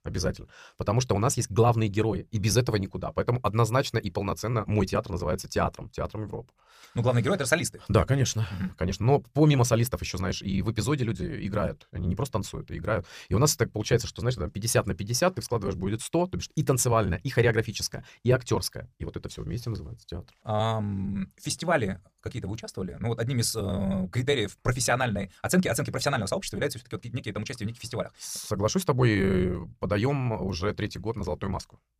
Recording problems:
wrong speed, natural pitch; too fast; 1.5 times normal speed

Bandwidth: 15 kHz